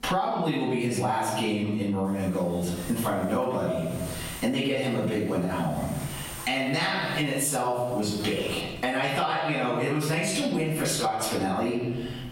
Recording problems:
off-mic speech; far
squashed, flat; heavily
room echo; noticeable; dies away in 0.8 s
electrical hum; noticeable; from 2 to 8.5 s; 50 Hz, 15 dB below the speech

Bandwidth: 16 kHz